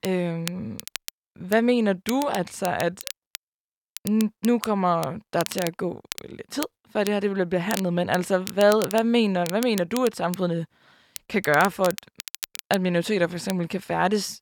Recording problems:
crackle, like an old record; noticeable; 15 dB below the speech

